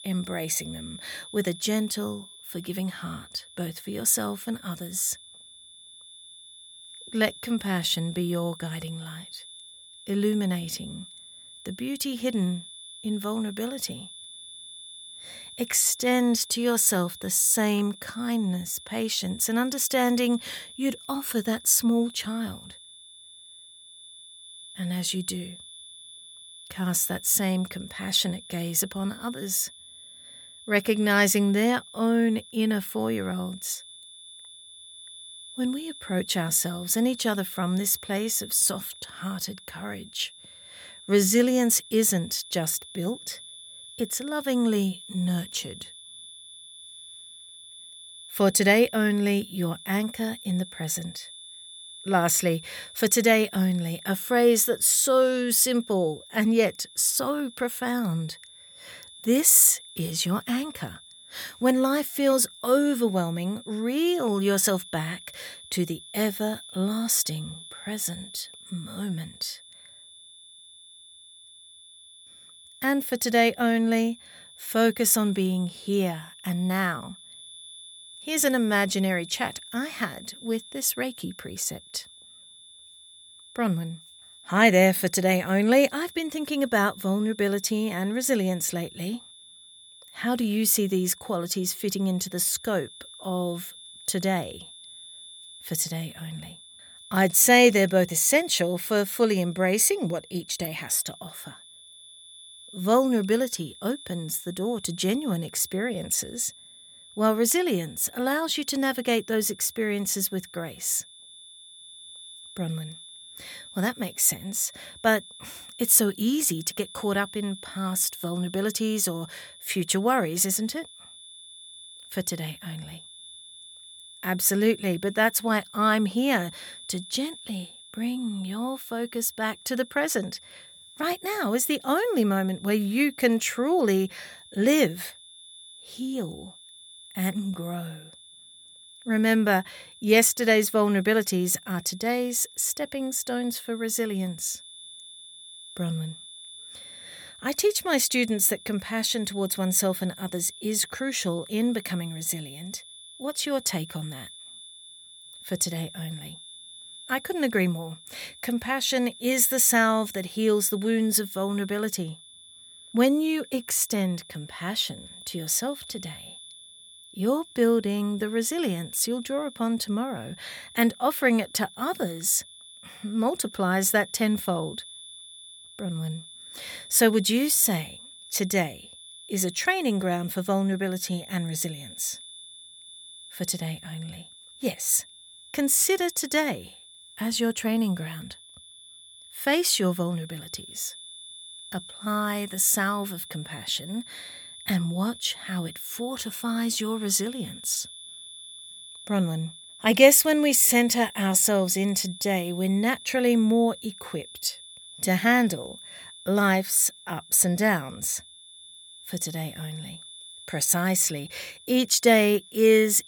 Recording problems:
high-pitched whine; noticeable; throughout; 3.5 kHz, 20 dB below the speech

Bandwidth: 18.5 kHz